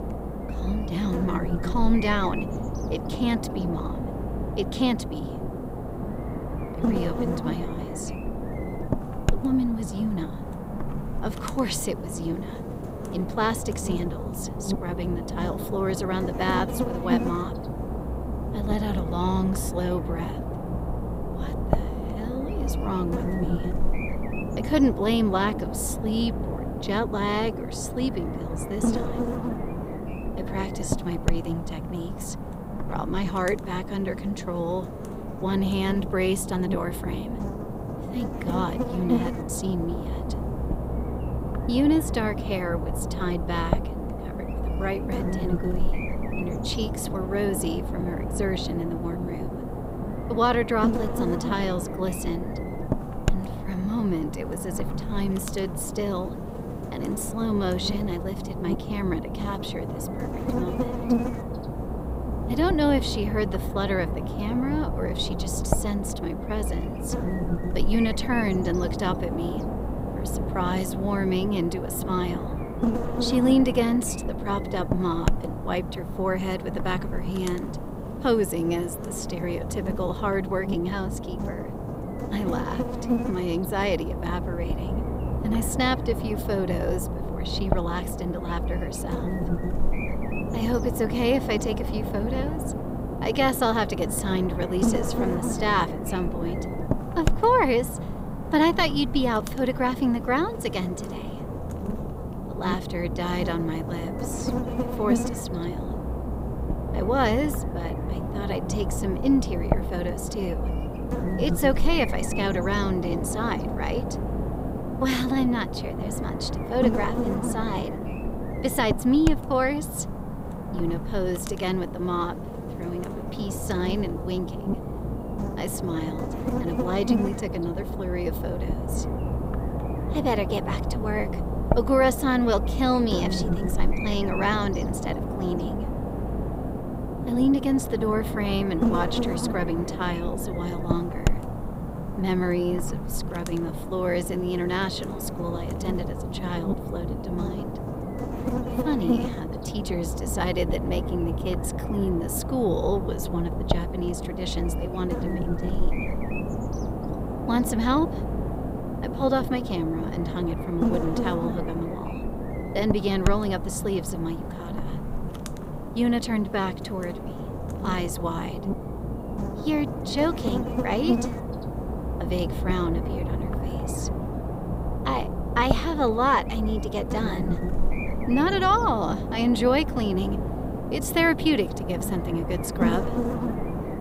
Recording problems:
electrical hum; loud; throughout; 60 Hz, 6 dB below the speech

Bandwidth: 15.5 kHz